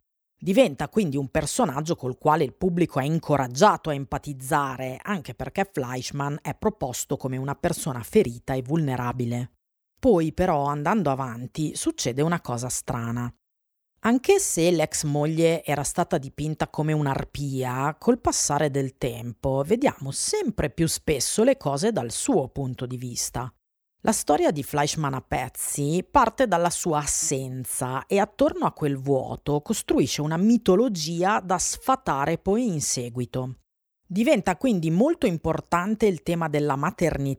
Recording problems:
none

